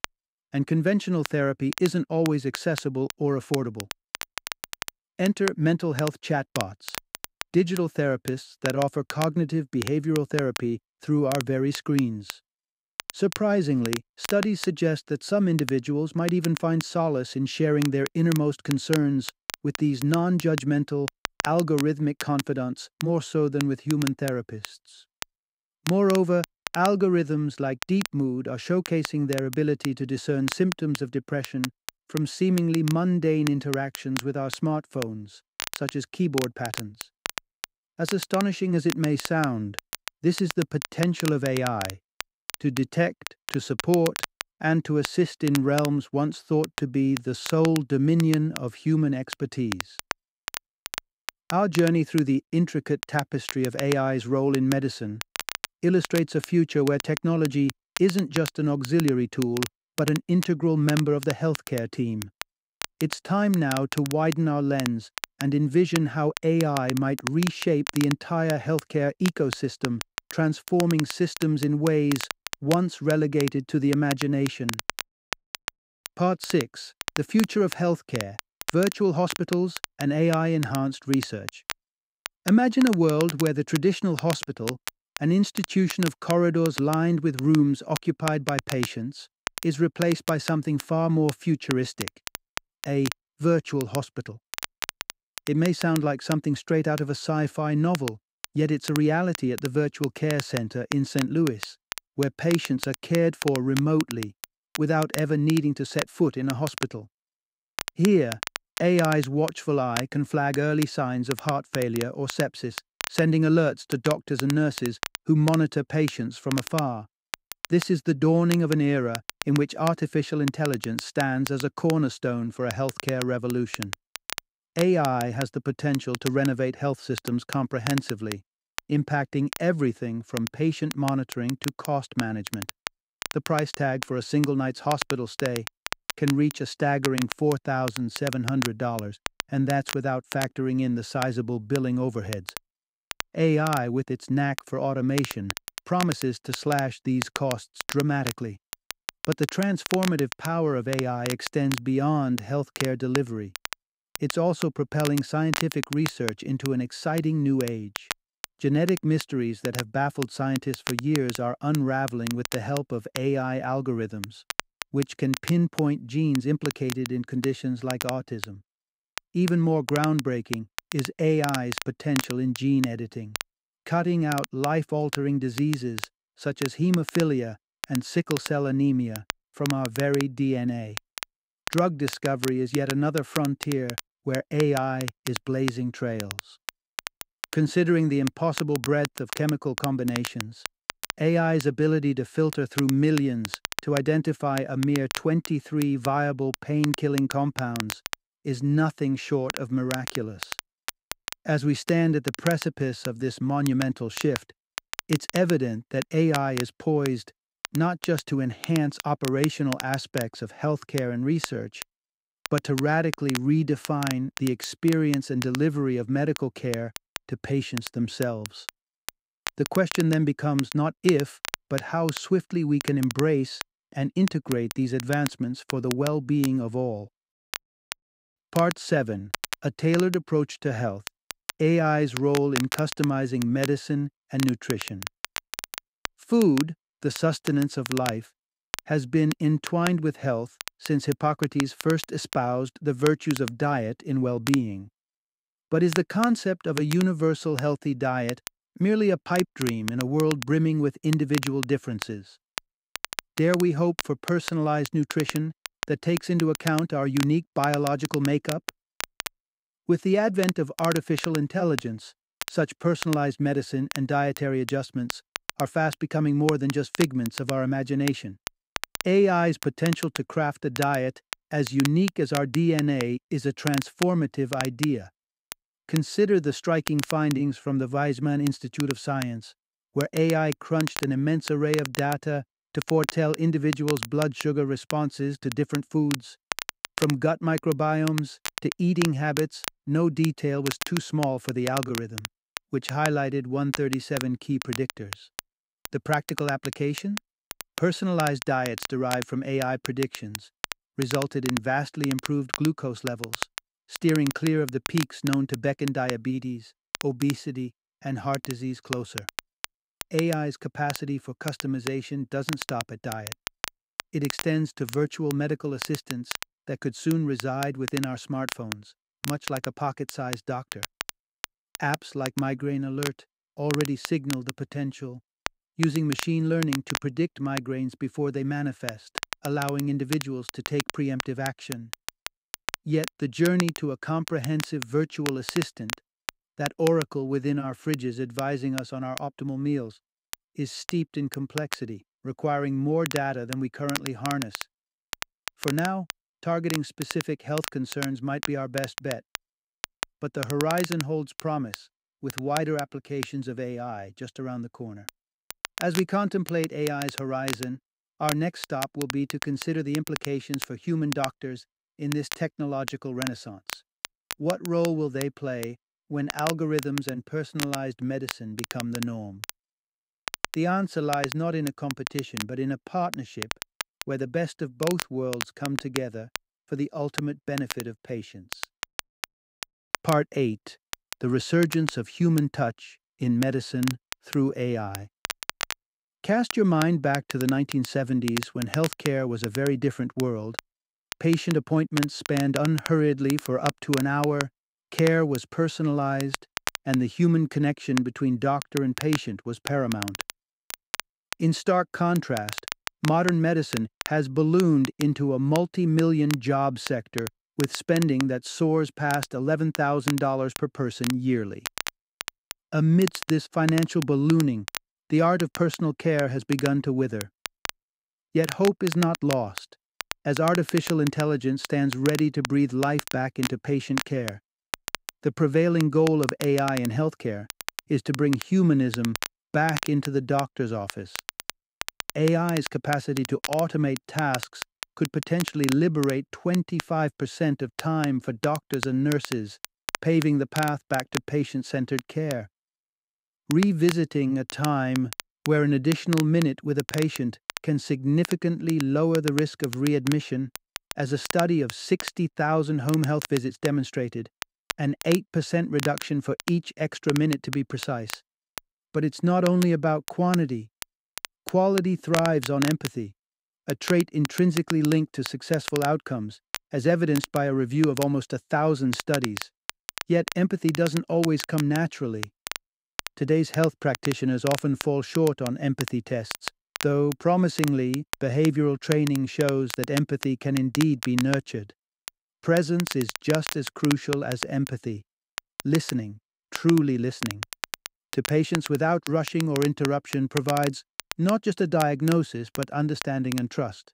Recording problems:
crackle, like an old record; noticeable; 10 dB below the speech

